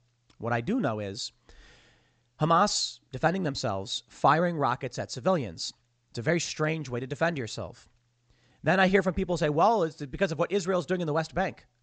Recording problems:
high frequencies cut off; noticeable; nothing above 8 kHz

